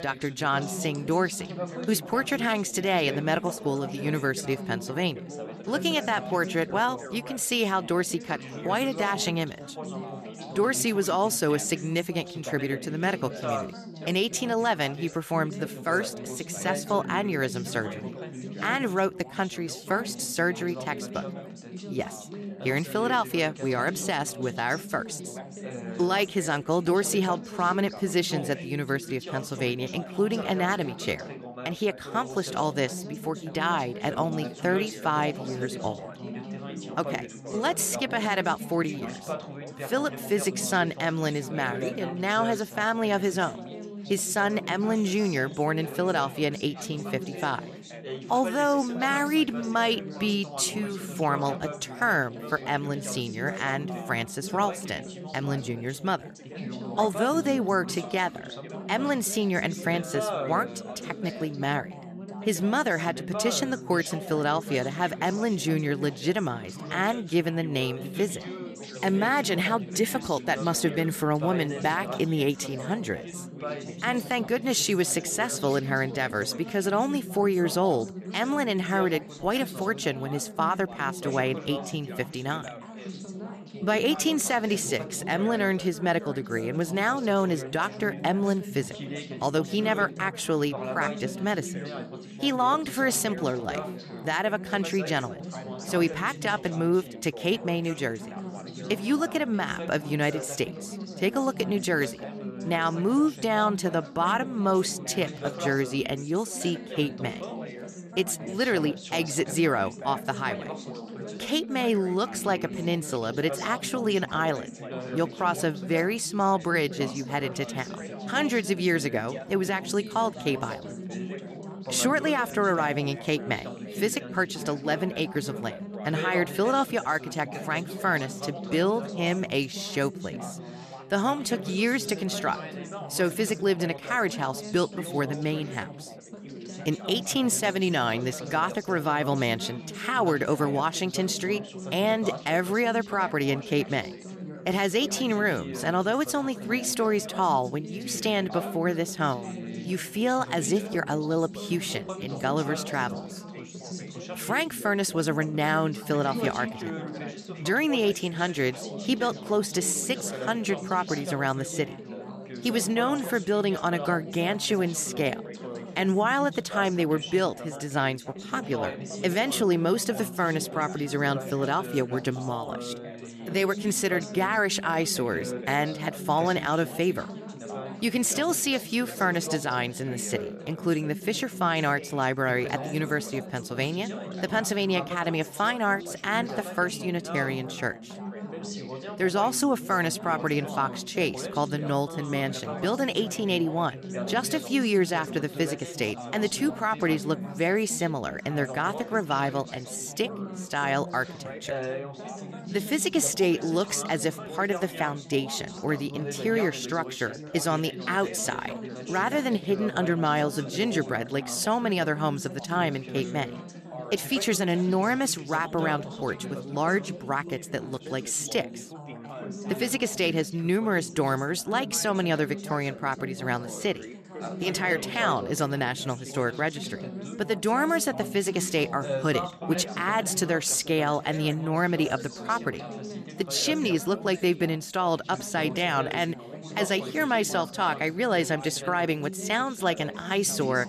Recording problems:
background chatter; noticeable; throughout; 4 voices, 10 dB below the speech

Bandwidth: 14 kHz